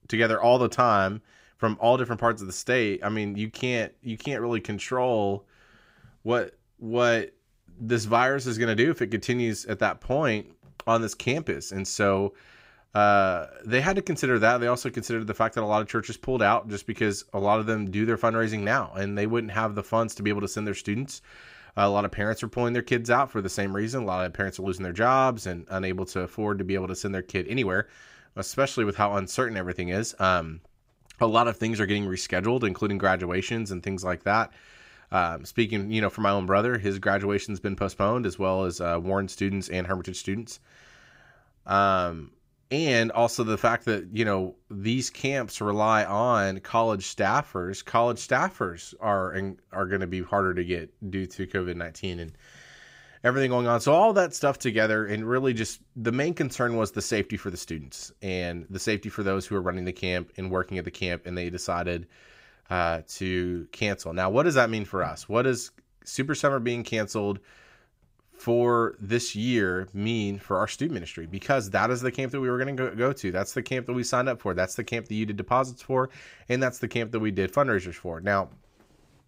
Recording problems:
none

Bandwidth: 15.5 kHz